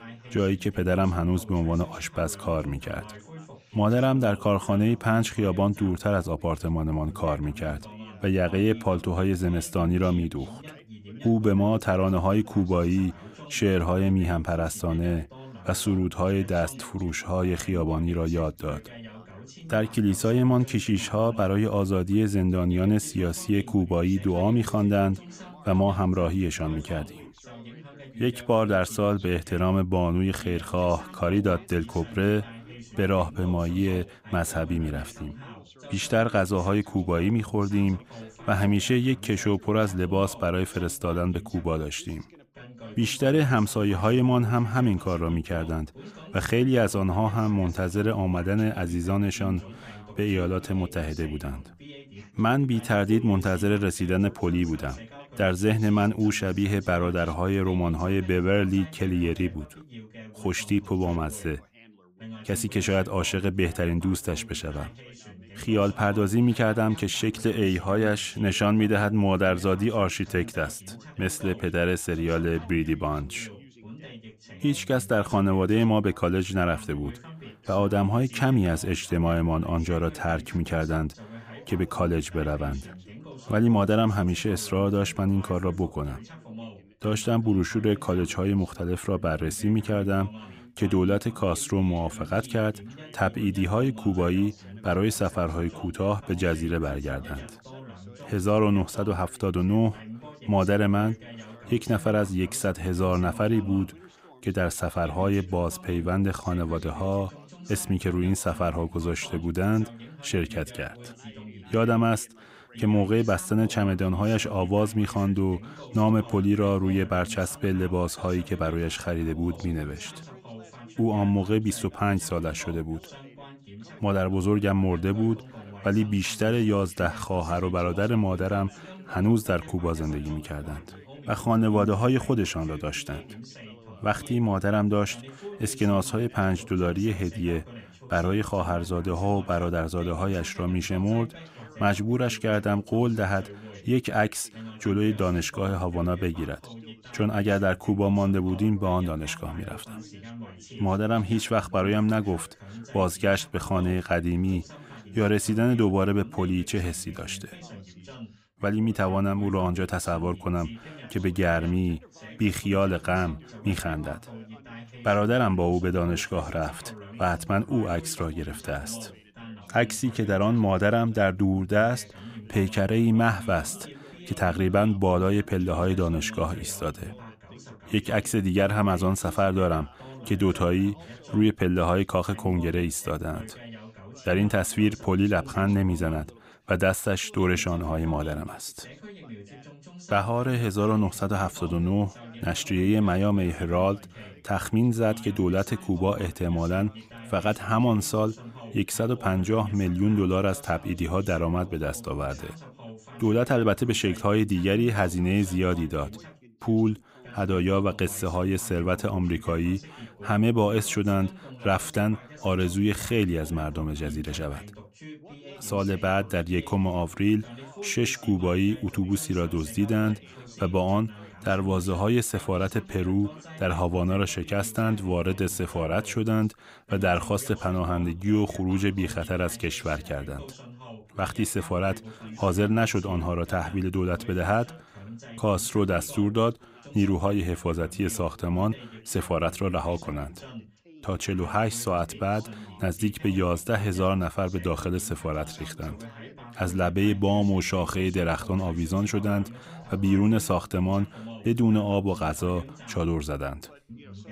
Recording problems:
background chatter; noticeable; throughout; 2 voices, 20 dB below the speech

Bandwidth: 15.5 kHz